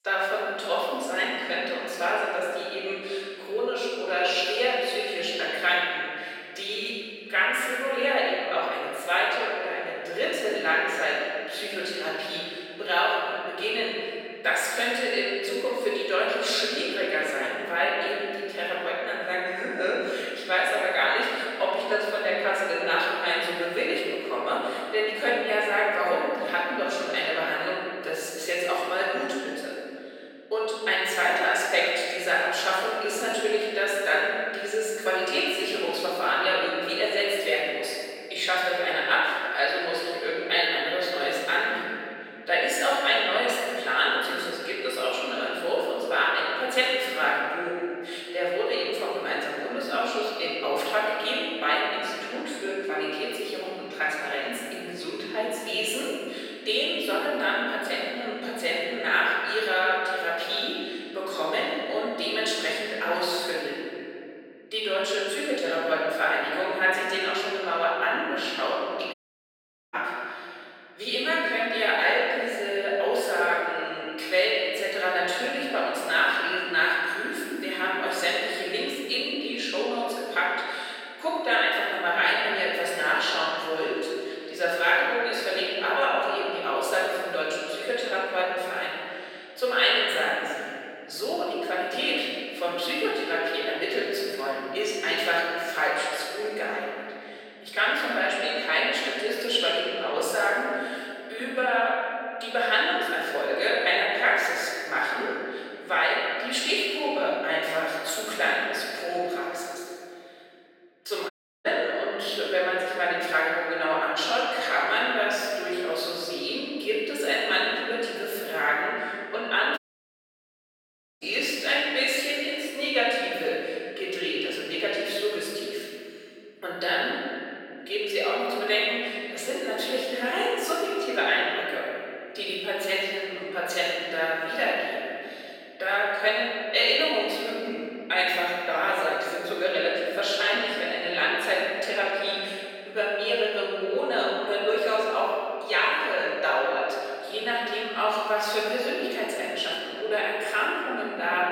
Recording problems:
room echo; strong; dies away in 2.6 s
off-mic speech; far
thin; very; fading below 450 Hz
audio cutting out; at 1:09 for 1 s, at 1:51 and at 2:00 for 1.5 s

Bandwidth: 16.5 kHz